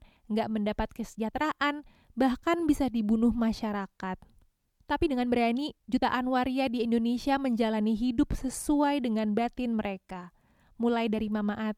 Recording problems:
uneven, jittery; strongly; from 1 to 11 s

